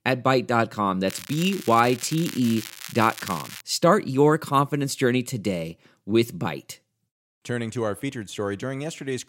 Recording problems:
crackling; noticeable; from 1 to 3.5 s; 15 dB below the speech

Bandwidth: 16 kHz